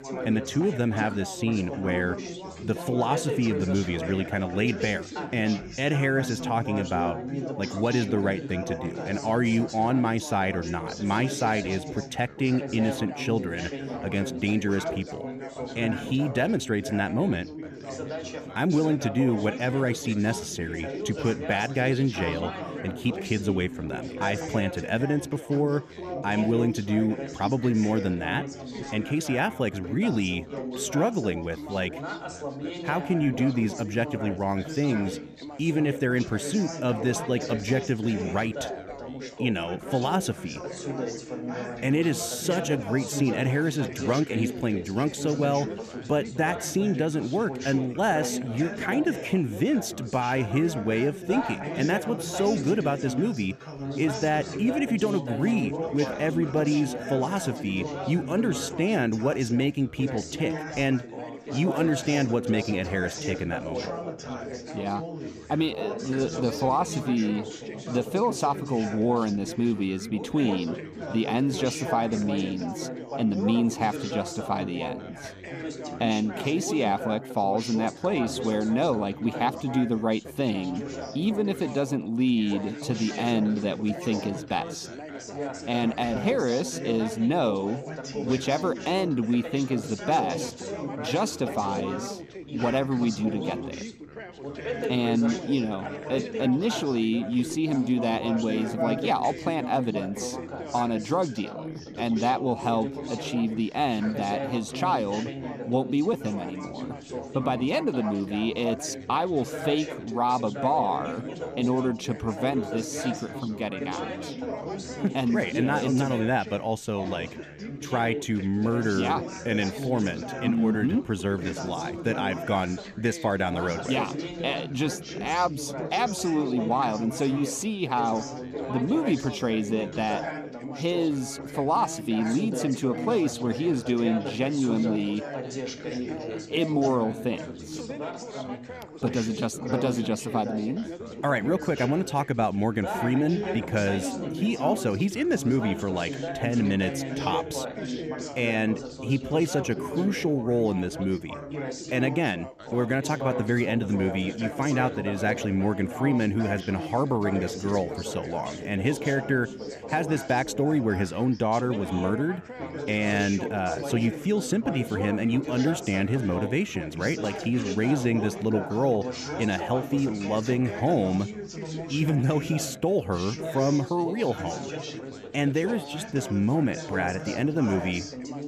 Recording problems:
background chatter; loud; throughout; 4 voices, 8 dB below the speech

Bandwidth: 14.5 kHz